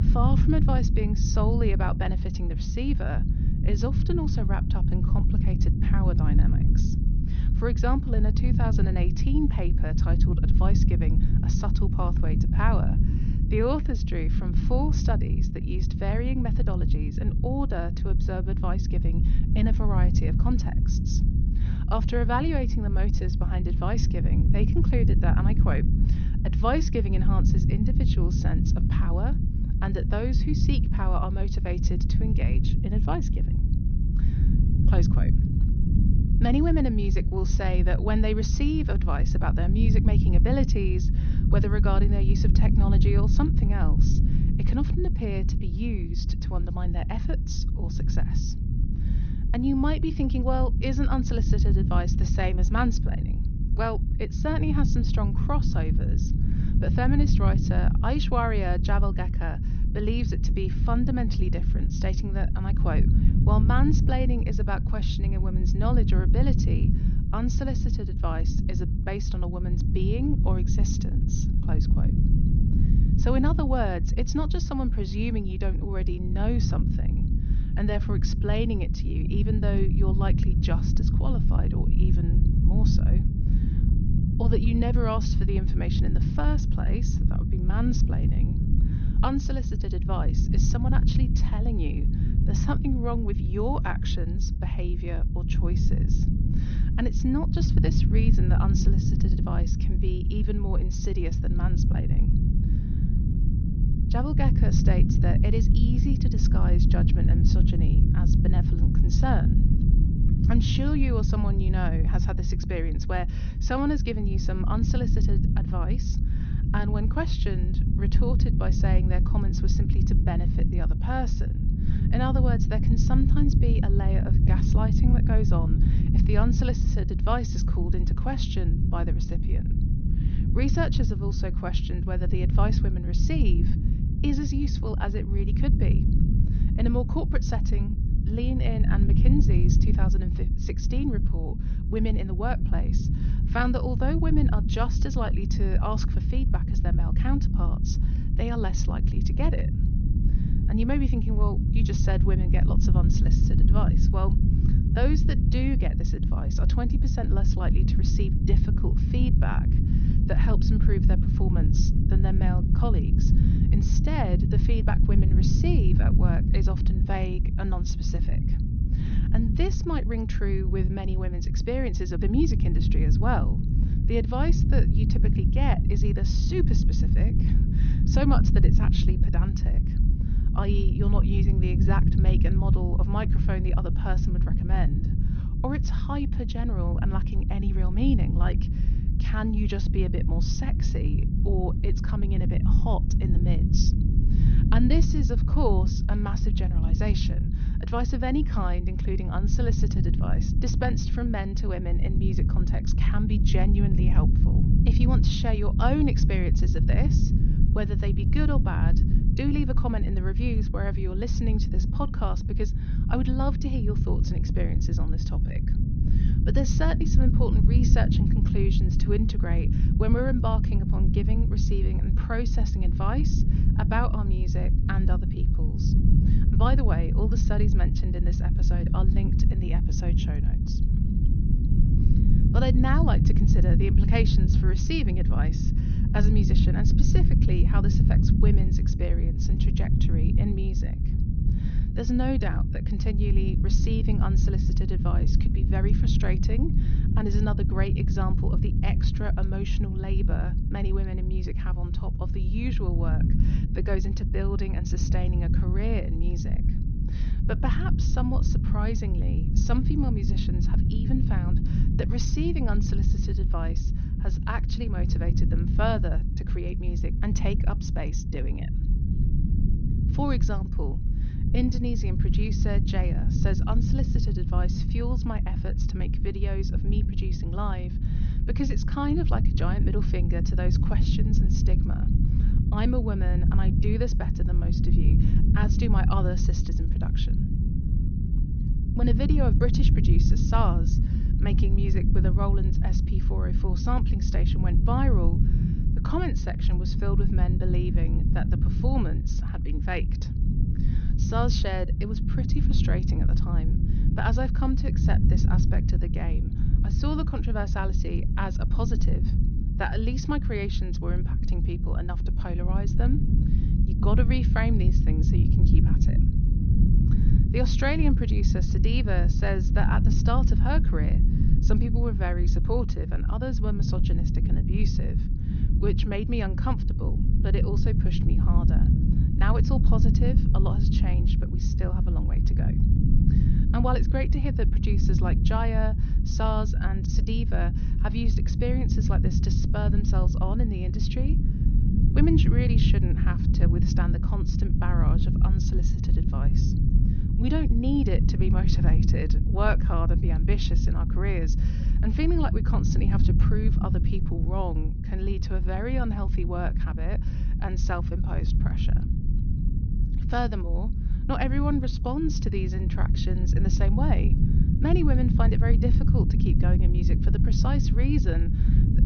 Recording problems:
high frequencies cut off; noticeable; nothing above 6.5 kHz
low rumble; loud; throughout; 4 dB below the speech

